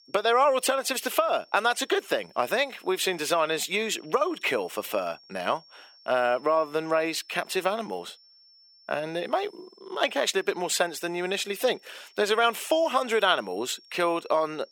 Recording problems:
thin; somewhat; fading below 450 Hz
high-pitched whine; faint; throughout; 5.5 kHz, 25 dB below the speech

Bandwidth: 17 kHz